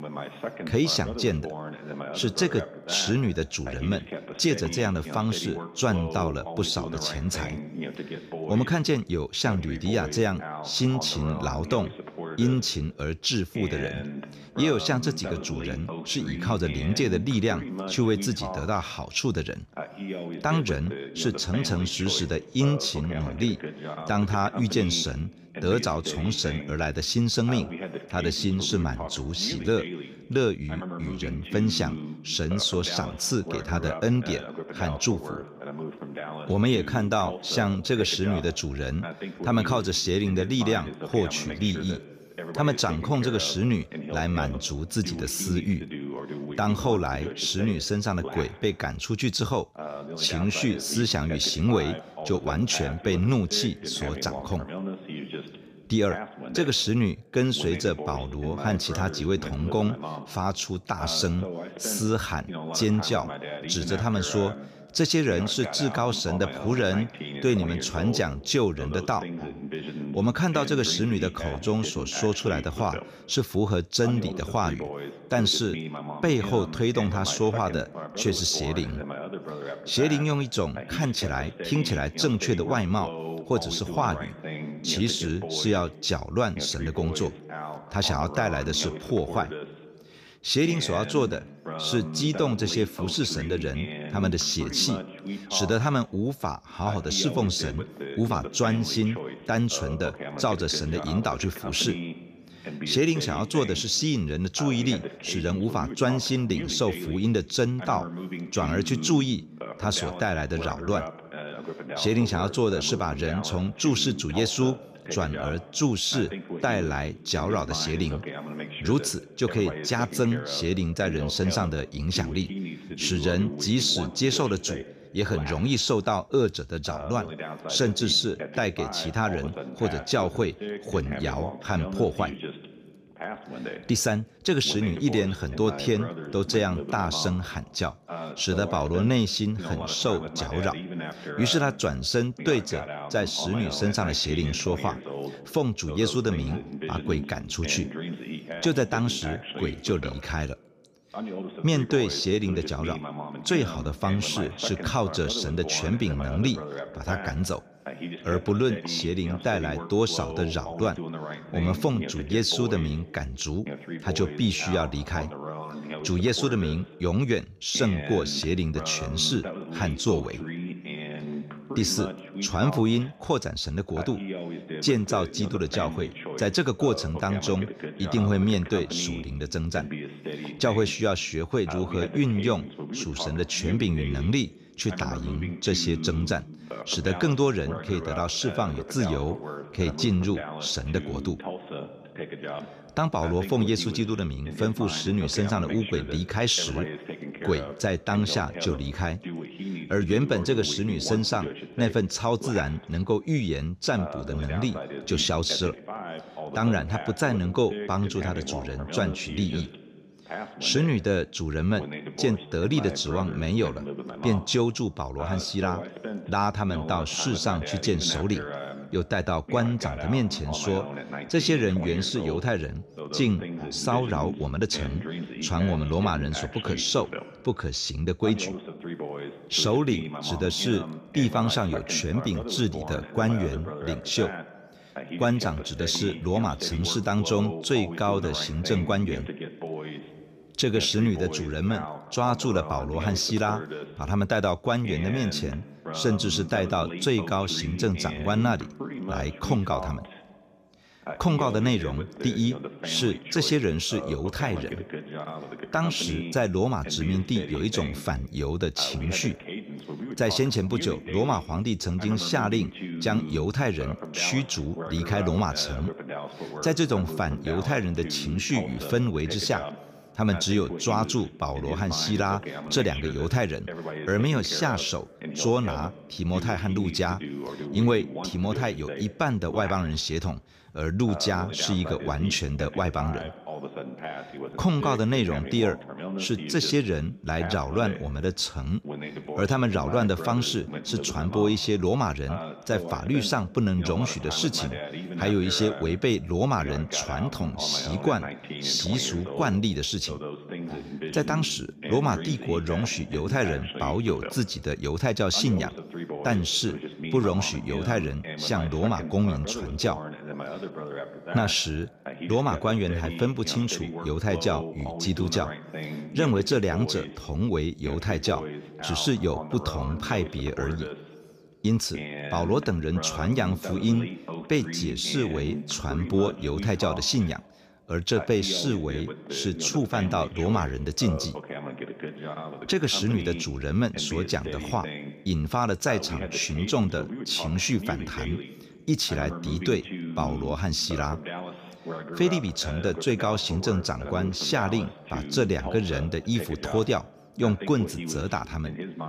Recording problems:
voice in the background; loud; throughout; 10 dB below the speech

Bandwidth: 15 kHz